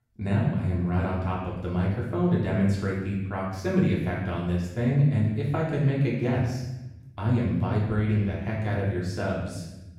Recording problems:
off-mic speech; far
room echo; noticeable; dies away in 0.9 s

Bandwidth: 16.5 kHz